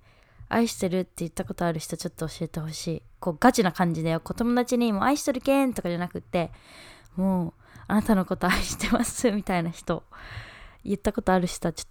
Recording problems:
none

